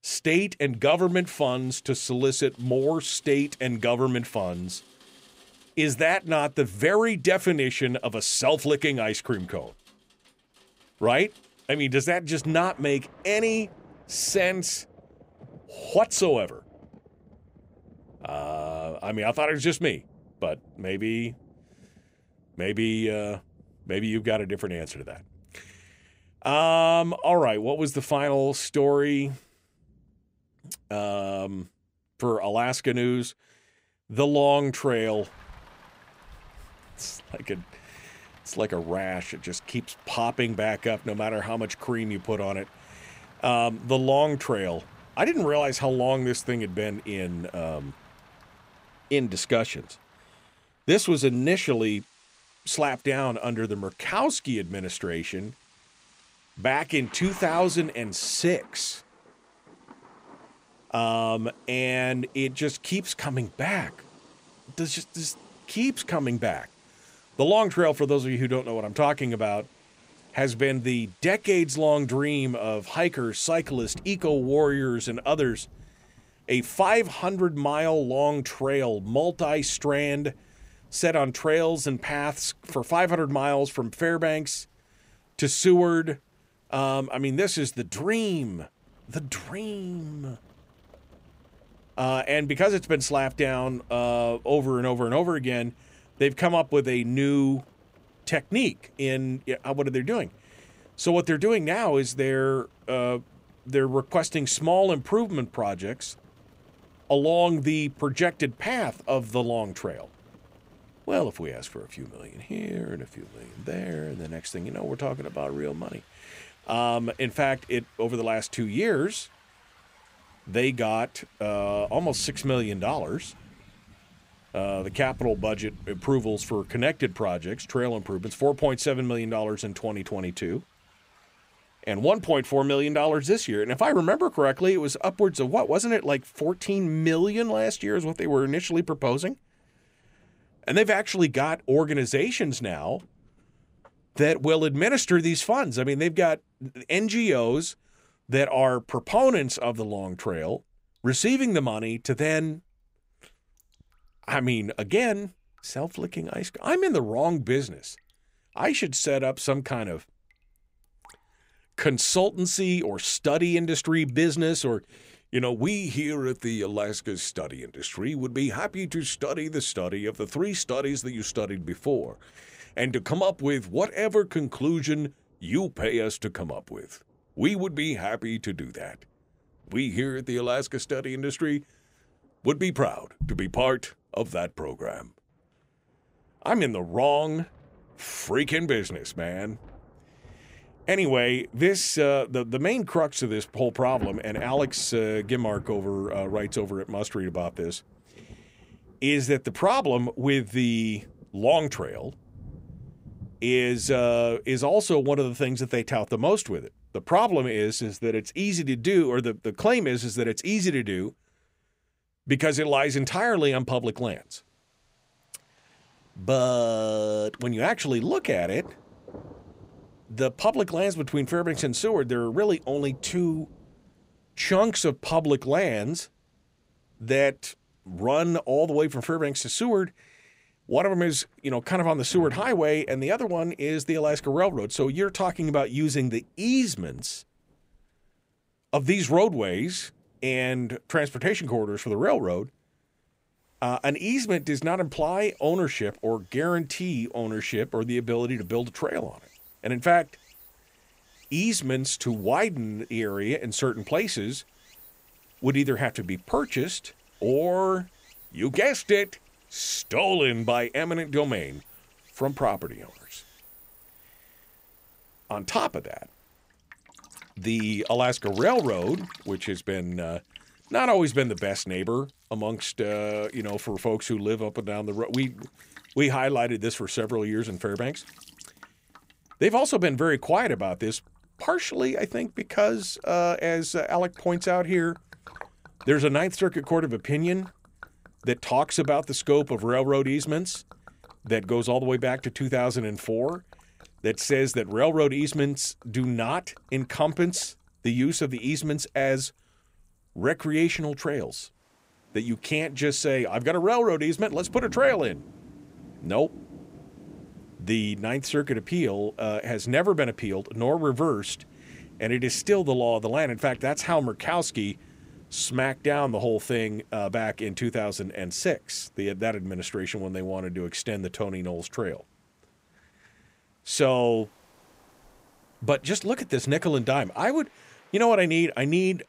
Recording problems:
rain or running water; faint; throughout; 25 dB below the speech

